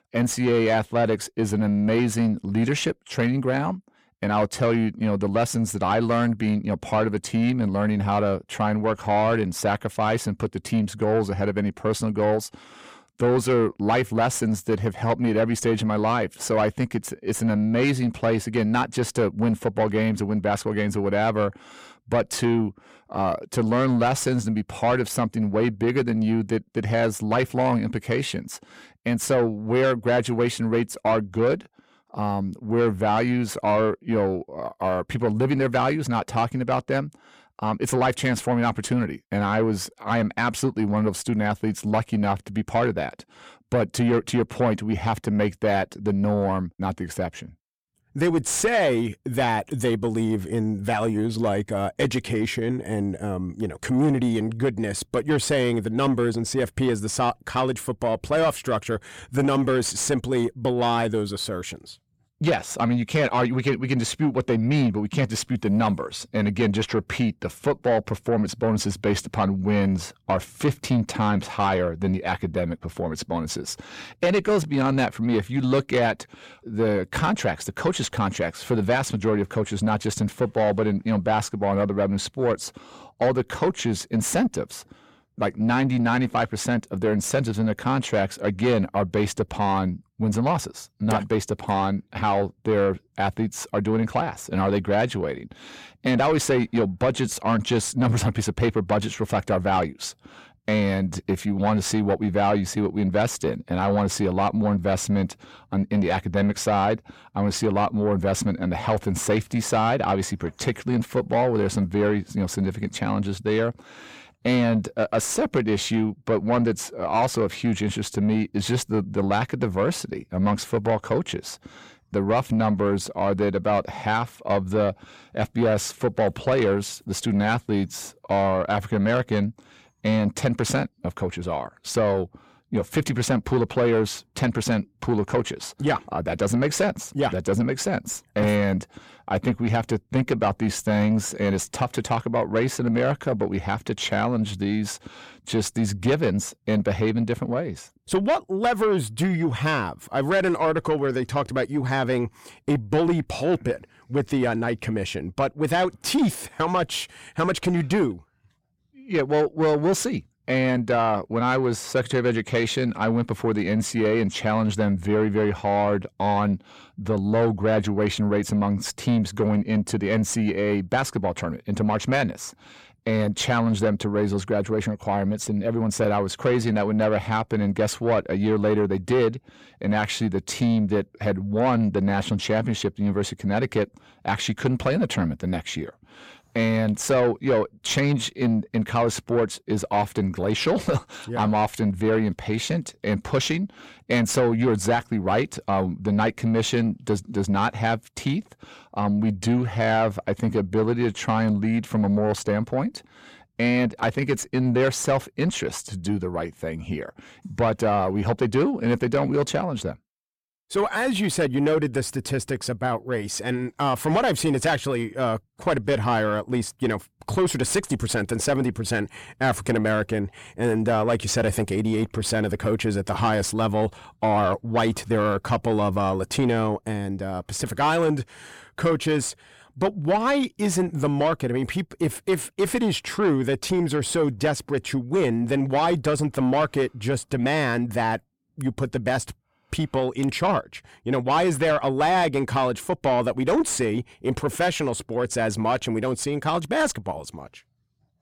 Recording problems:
distortion; slight; 10 dB below the speech

